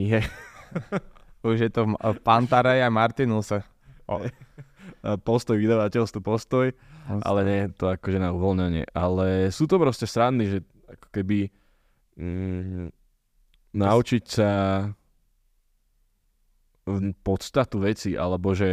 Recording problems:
abrupt cut into speech; at the start and the end

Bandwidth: 15 kHz